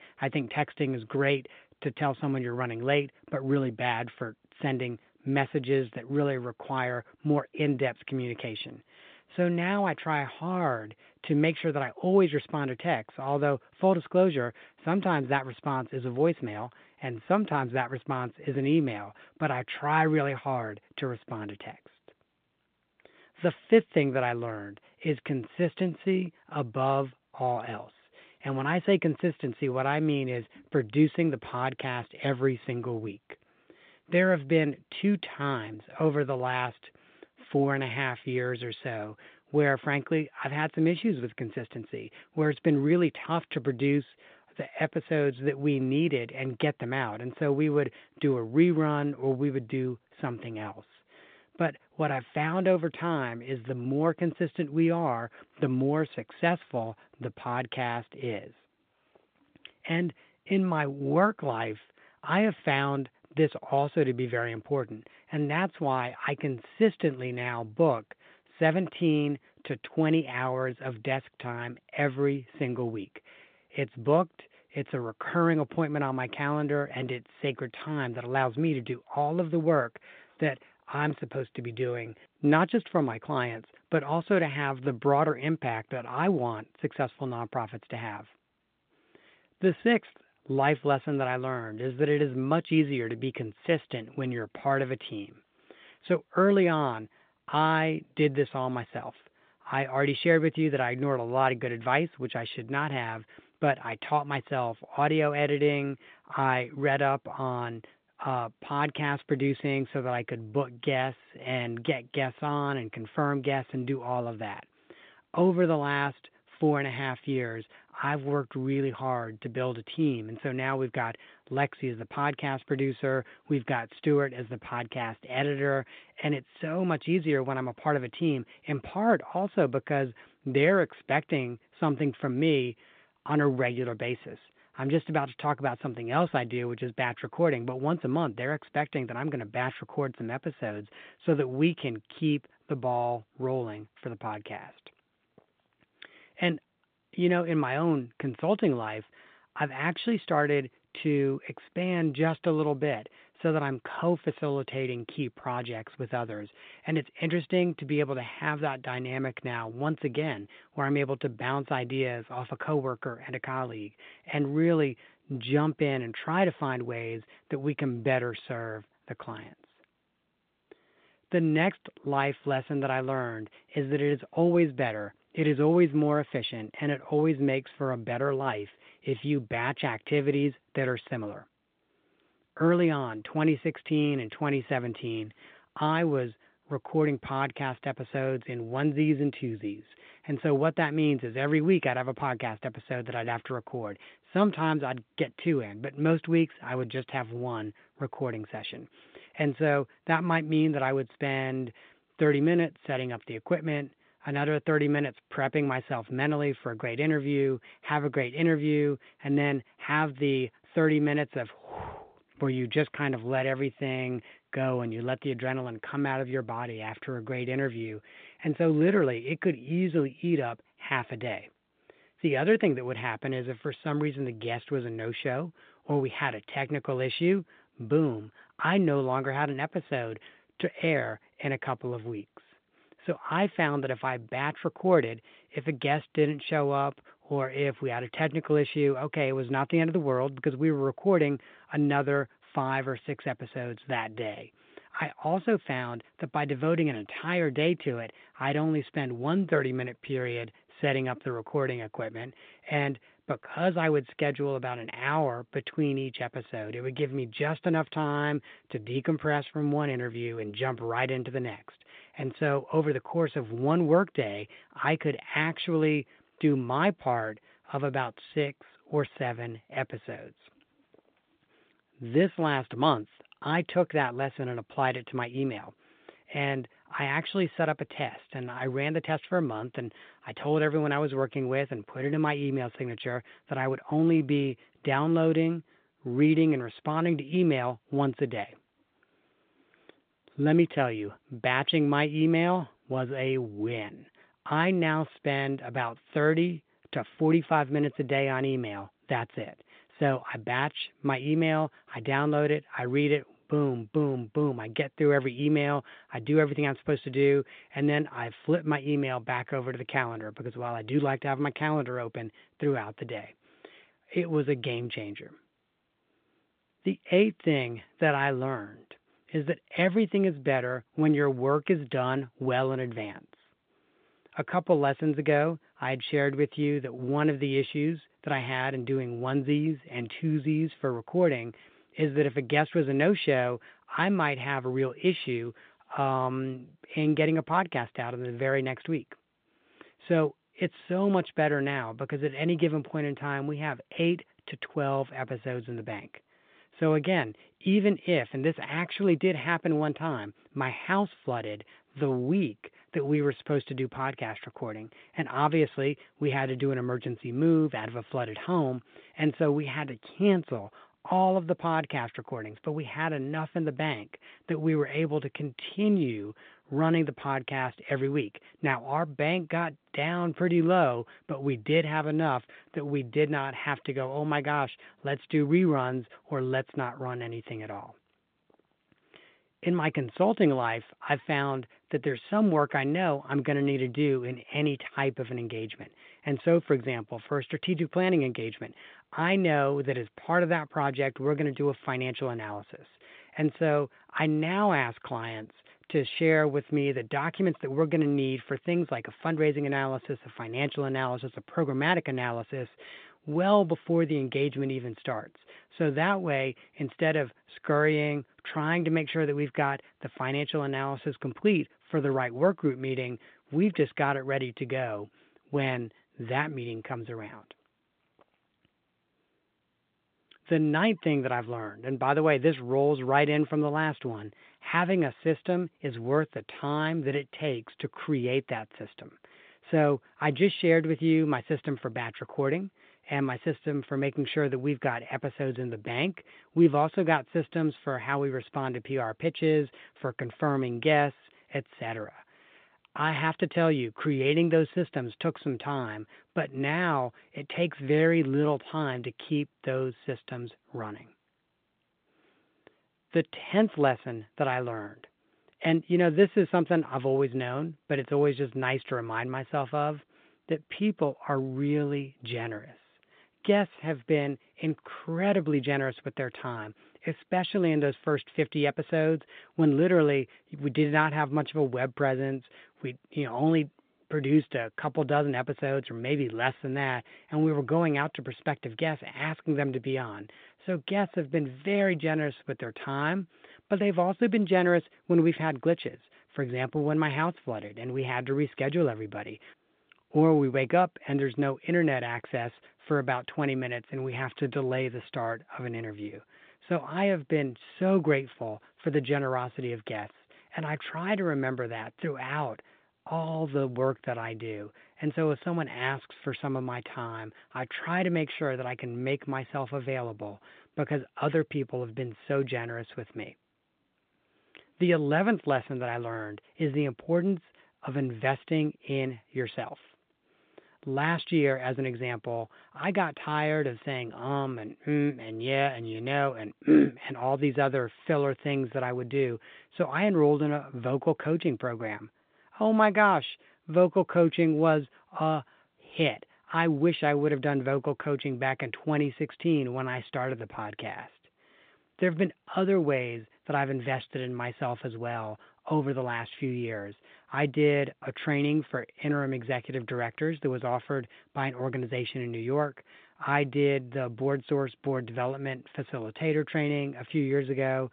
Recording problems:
phone-call audio; nothing above 3.5 kHz

